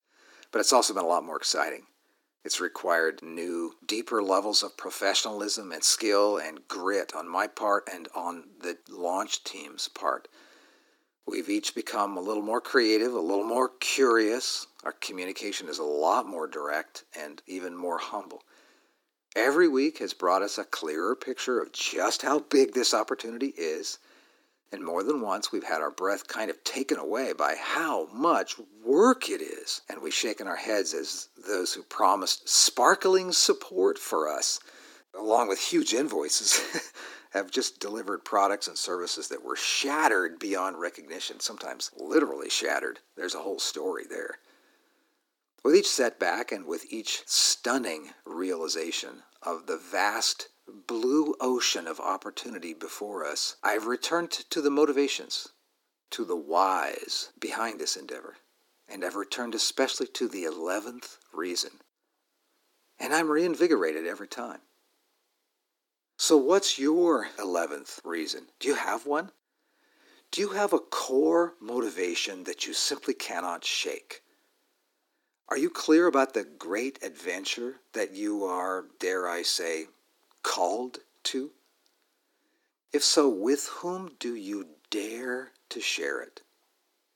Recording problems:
thin; somewhat; fading below 300 Hz

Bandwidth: 17.5 kHz